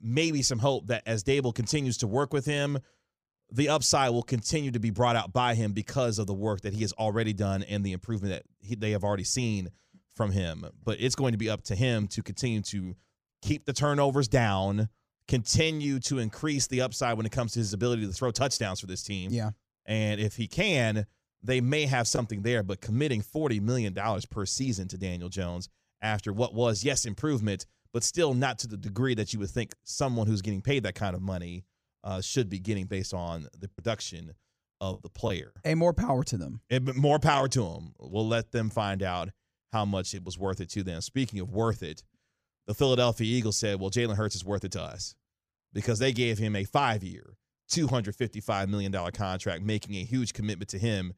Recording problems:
choppy; very; from 34 to 36 s; 6% of the speech affected

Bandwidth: 15 kHz